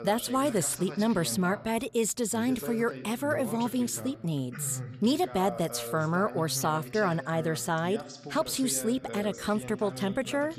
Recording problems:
voice in the background; noticeable; throughout; 10 dB below the speech

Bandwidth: 14.5 kHz